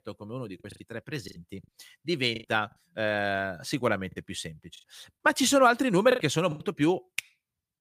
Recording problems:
choppy; very; 7% of the speech affected

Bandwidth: 15 kHz